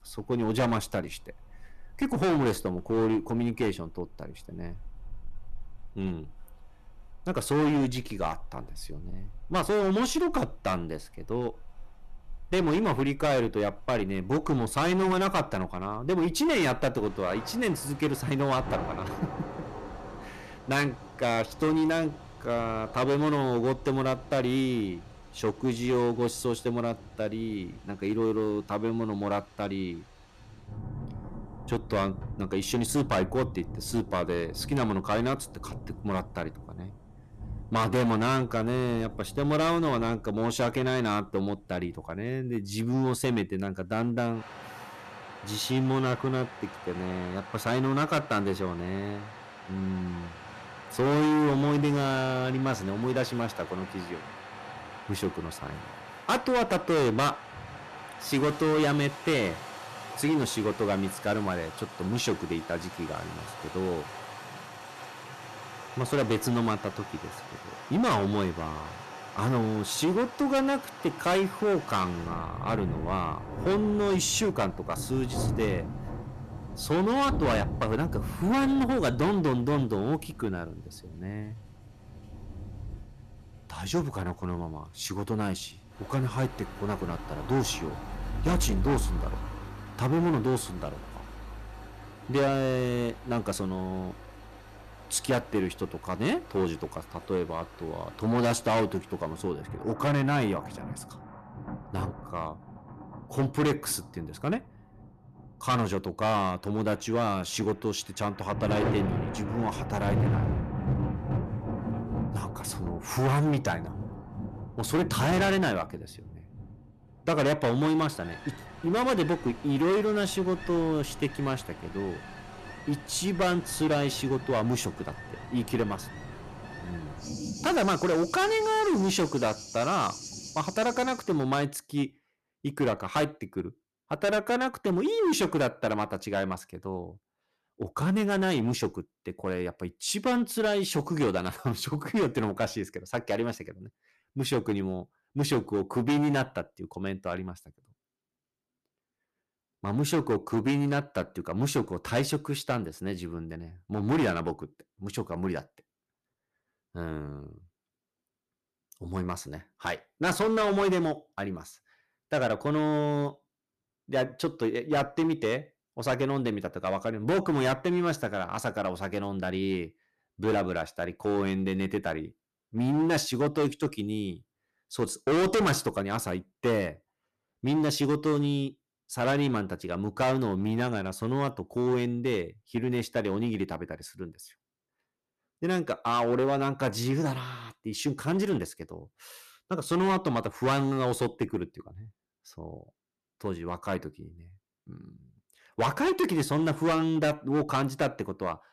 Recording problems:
distortion; heavy; 9% of the sound clipped
rain or running water; noticeable; until 2:11; 10 dB below the speech

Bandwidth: 14 kHz